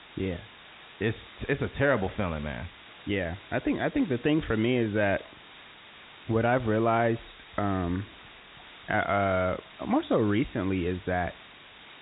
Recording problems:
high frequencies cut off; severe; nothing above 4 kHz
hiss; noticeable; throughout; 20 dB below the speech

